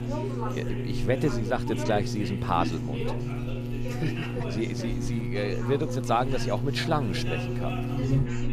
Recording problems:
electrical hum; loud; throughout; 60 Hz, 9 dB below the speech
background chatter; loud; throughout; 2 voices, 8 dB below the speech

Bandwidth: 14.5 kHz